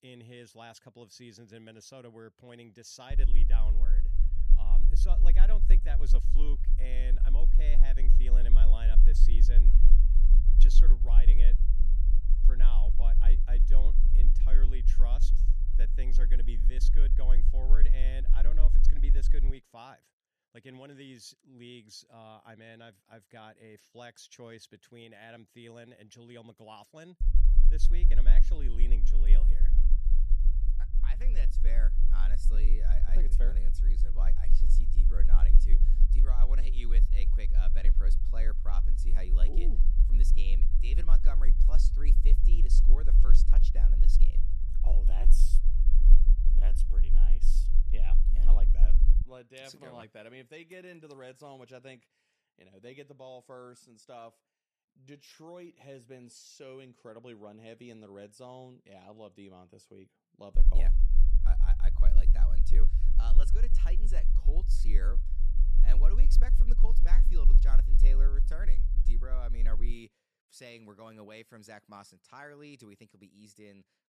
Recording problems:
low rumble; loud; from 3 to 20 s, from 27 to 49 s and from 1:01 to 1:10; 6 dB below the speech

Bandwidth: 14 kHz